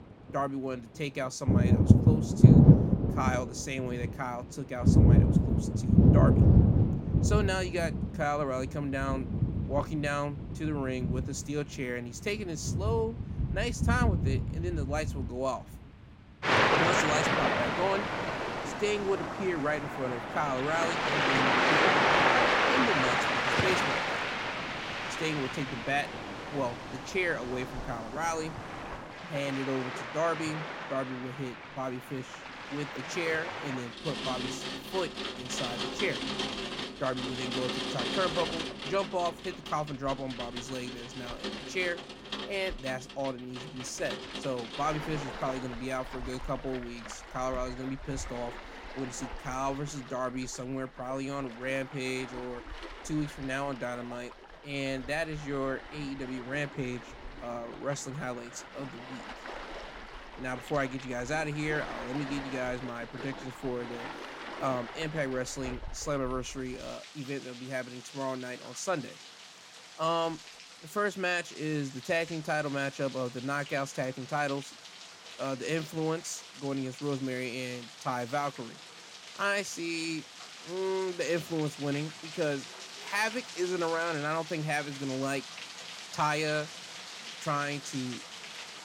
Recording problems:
rain or running water; very loud; throughout; 5 dB above the speech

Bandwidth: 16.5 kHz